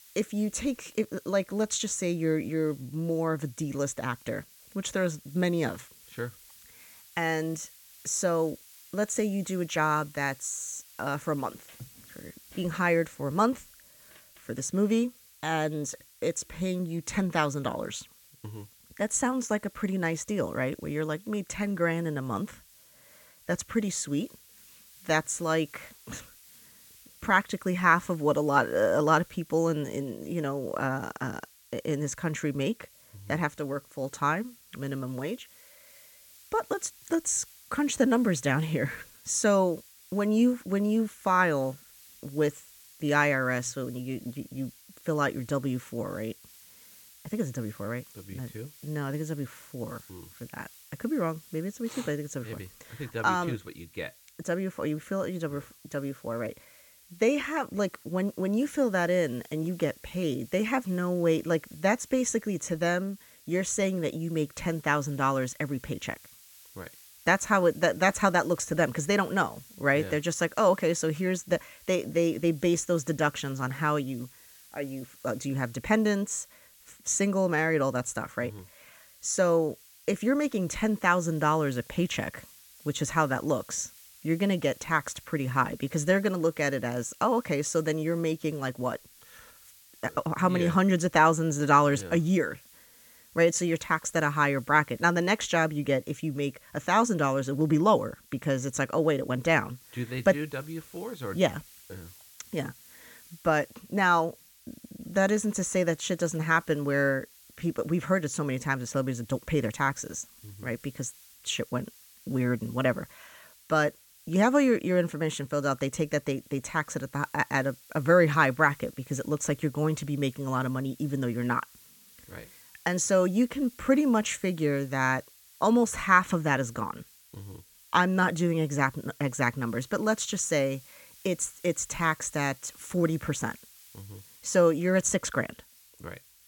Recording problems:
hiss; faint; throughout; 25 dB below the speech

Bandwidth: 17 kHz